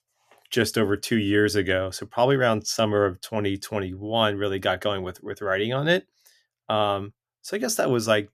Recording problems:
none

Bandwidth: 14.5 kHz